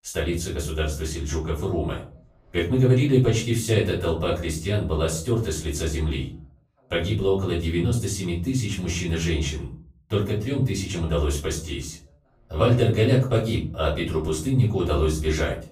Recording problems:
off-mic speech; far
room echo; slight; dies away in 0.4 s

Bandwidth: 15 kHz